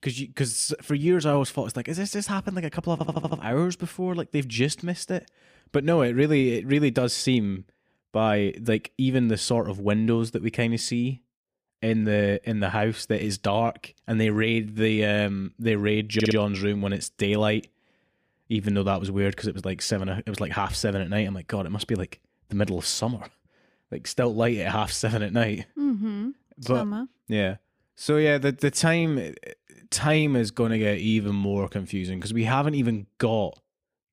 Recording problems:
audio stuttering; at 3 s and at 16 s

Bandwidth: 15 kHz